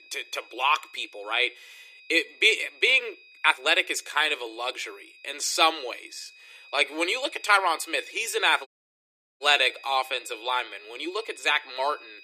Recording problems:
thin; very; fading below 300 Hz
high-pitched whine; faint; throughout; 2.5 kHz, 25 dB below the speech
uneven, jittery; strongly; from 1 to 11 s
audio cutting out; at 8.5 s for 0.5 s

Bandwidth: 14.5 kHz